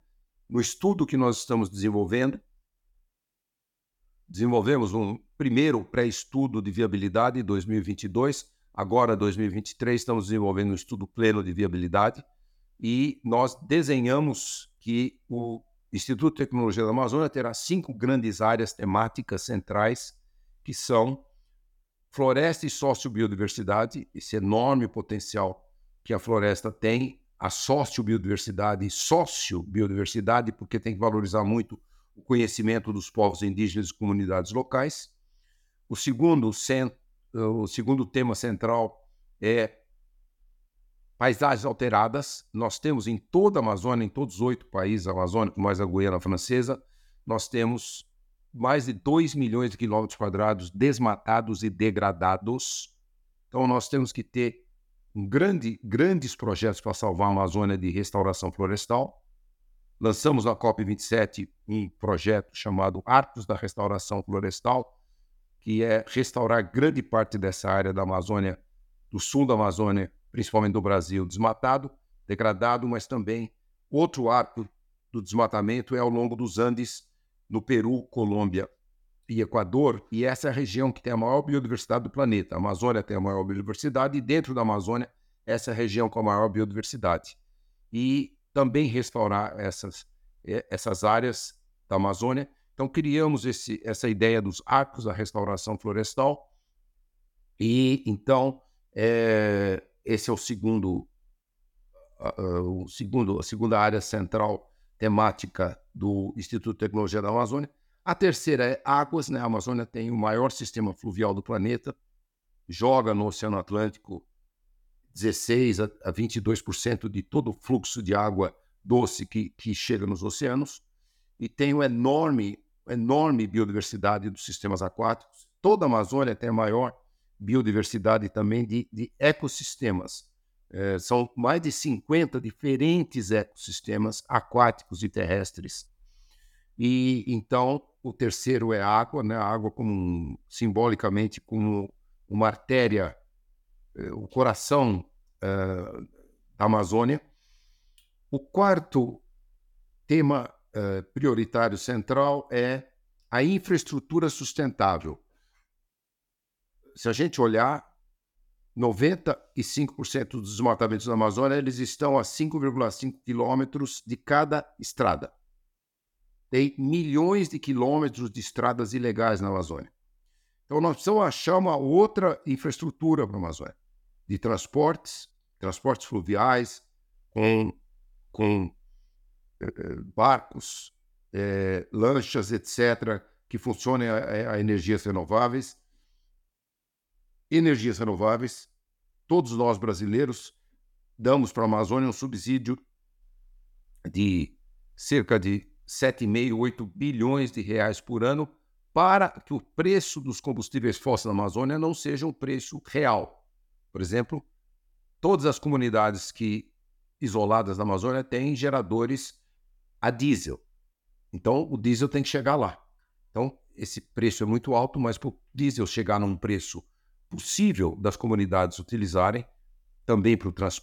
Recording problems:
none

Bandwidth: 17.5 kHz